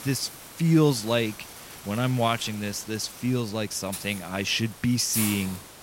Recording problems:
hiss; noticeable; throughout; 10 dB below the speech

